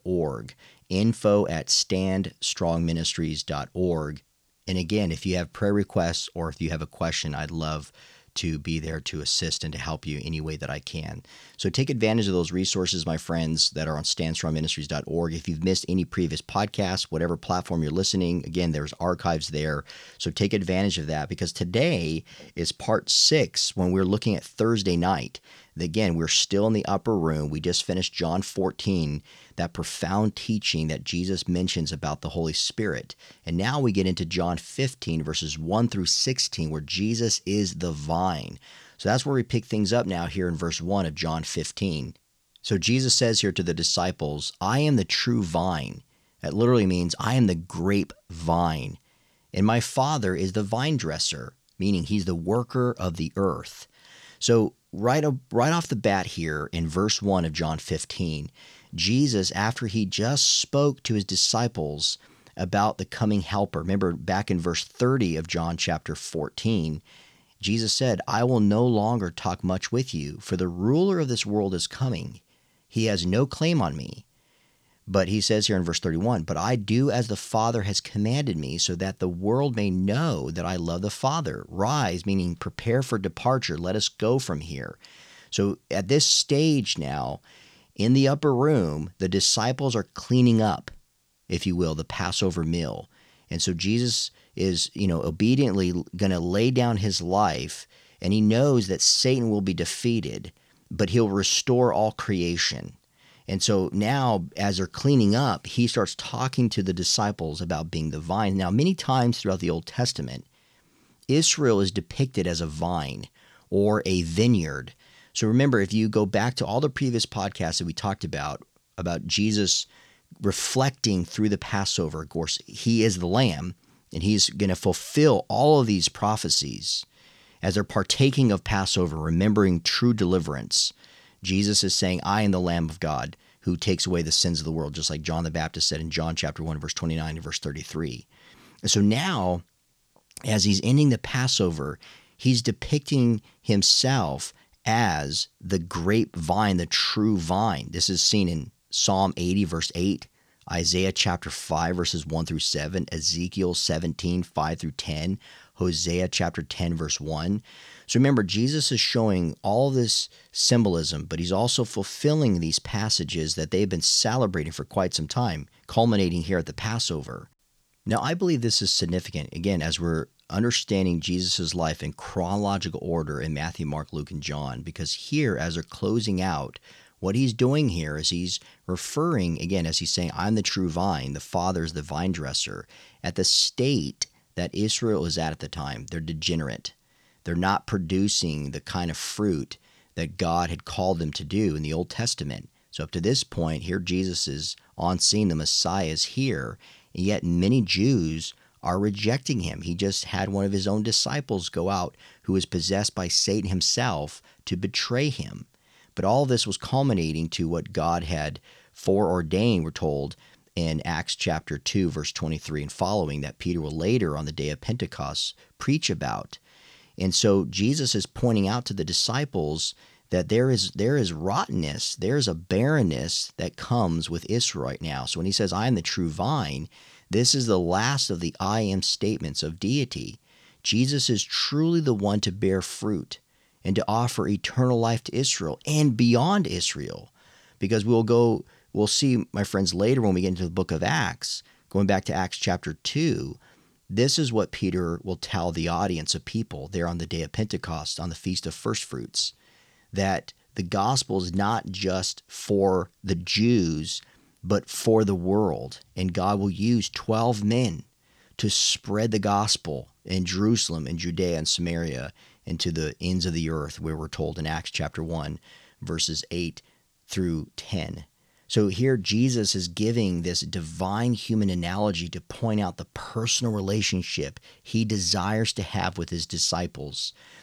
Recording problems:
none

